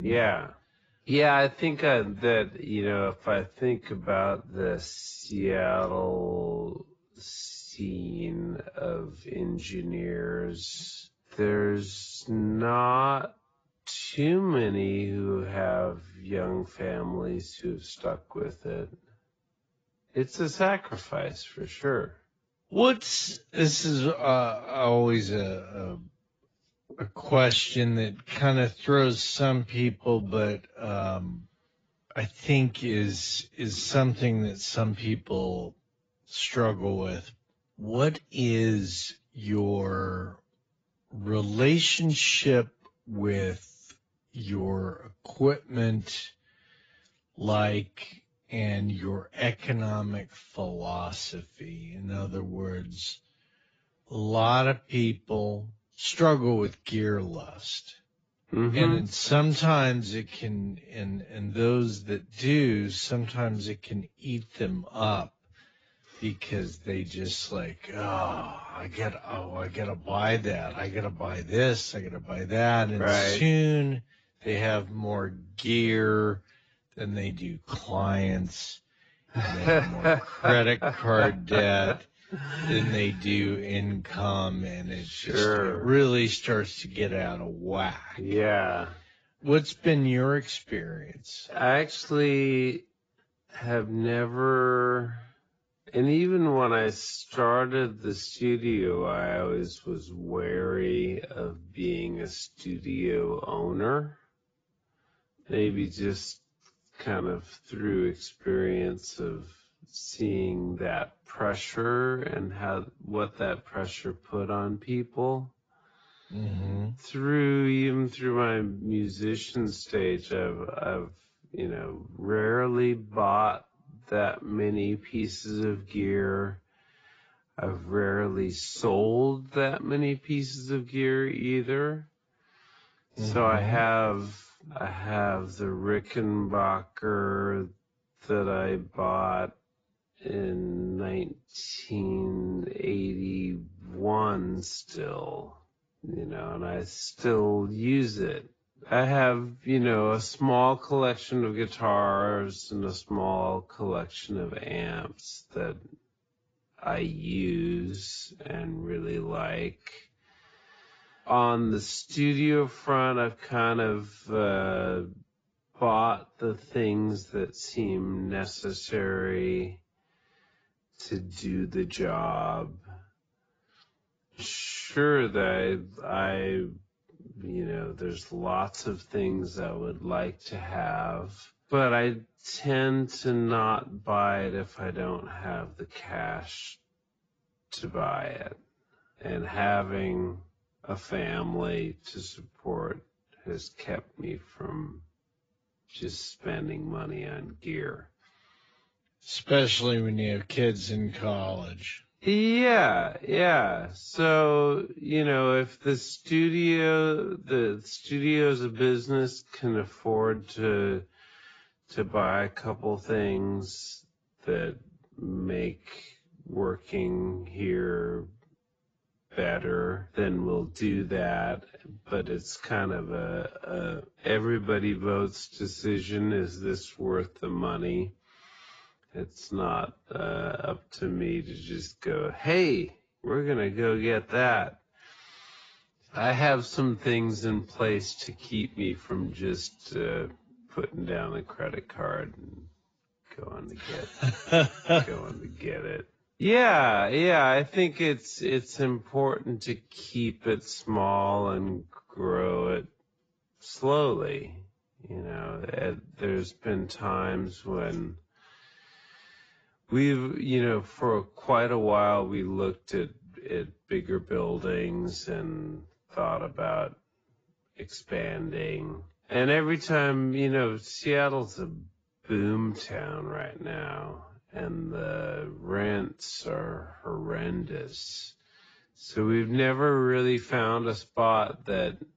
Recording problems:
garbled, watery; badly; nothing above 7.5 kHz
wrong speed, natural pitch; too slow; 0.6 times normal speed
abrupt cut into speech; at the start

